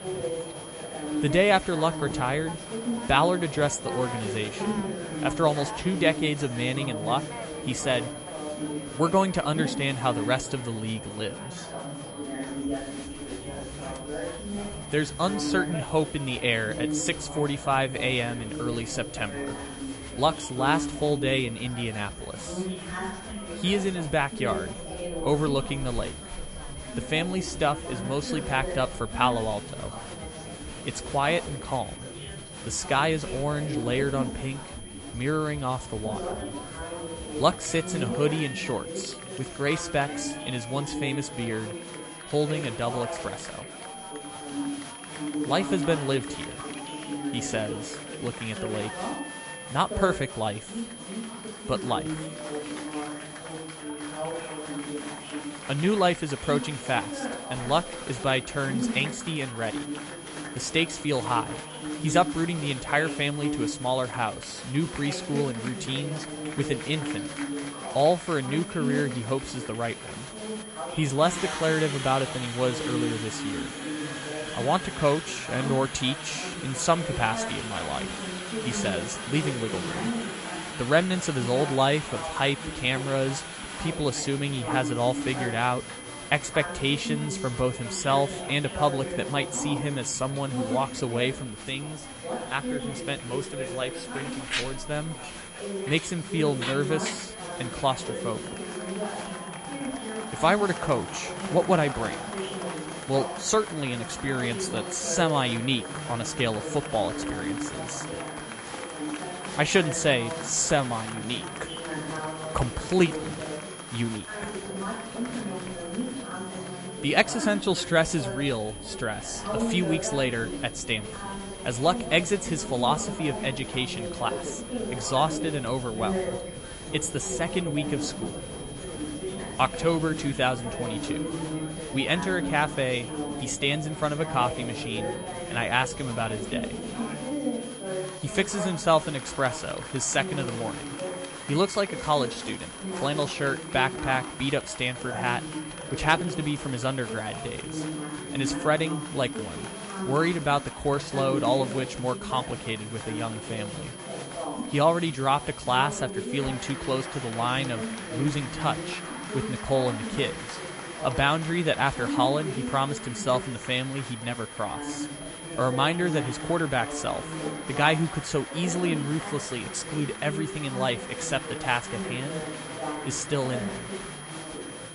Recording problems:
garbled, watery; slightly; nothing above 11 kHz
chatter from many people; loud; throughout; 7 dB below the speech
high-pitched whine; noticeable; throughout; 3 kHz, 15 dB below the speech

